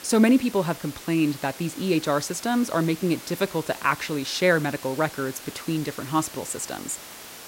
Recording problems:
hiss; noticeable; throughout; 15 dB below the speech

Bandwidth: 16 kHz